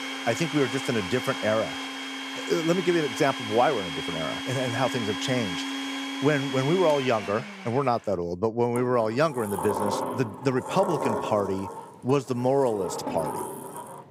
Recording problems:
household noises; loud; throughout; 6 dB below the speech

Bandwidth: 15.5 kHz